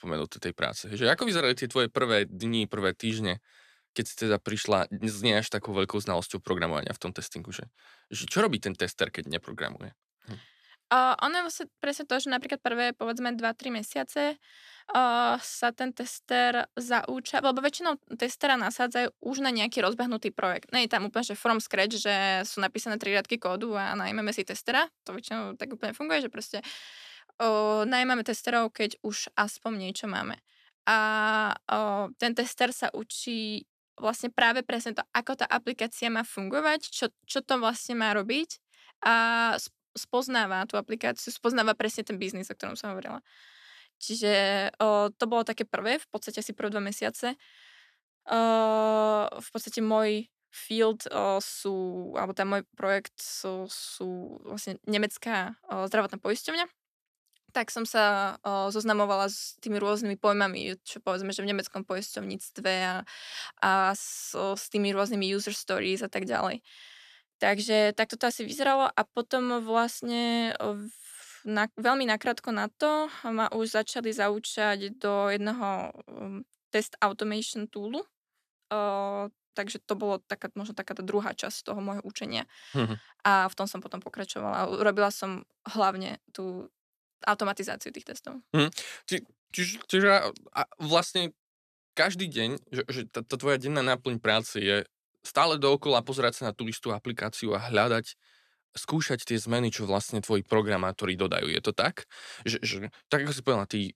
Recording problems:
none

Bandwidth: 14.5 kHz